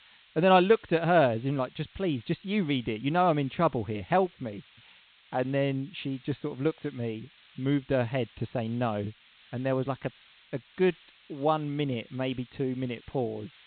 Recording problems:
high frequencies cut off; severe; nothing above 4 kHz
hiss; faint; throughout; 25 dB below the speech

